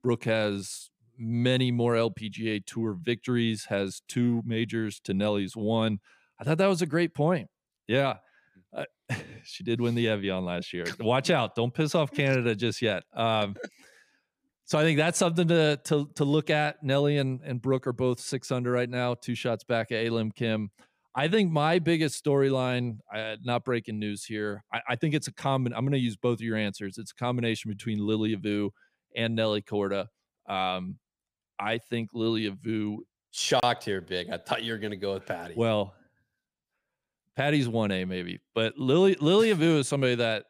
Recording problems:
none

